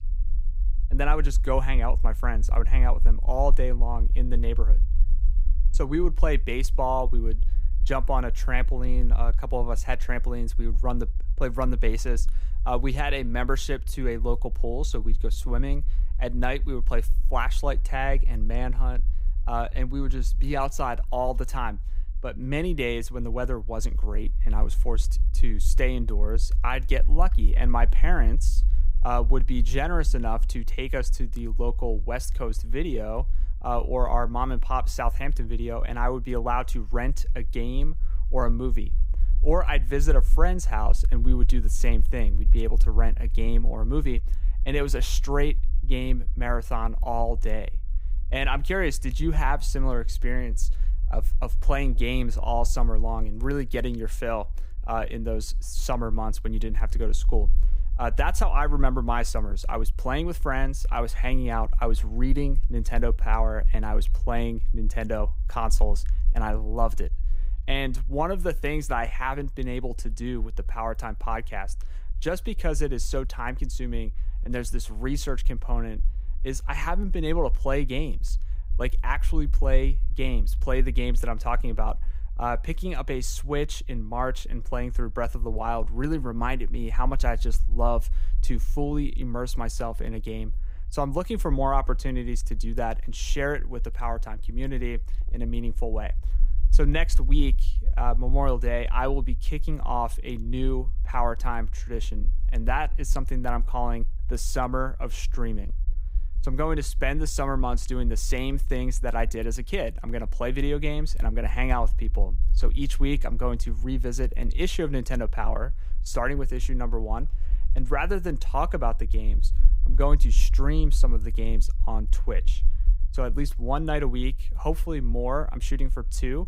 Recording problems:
low rumble; faint; throughout; 25 dB below the speech

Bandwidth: 15.5 kHz